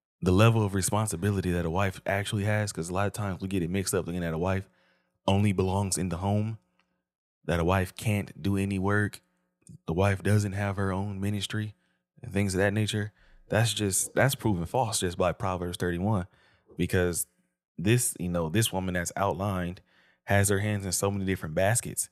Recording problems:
none

